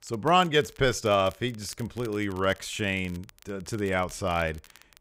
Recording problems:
crackle, like an old record; faint; 25 dB below the speech

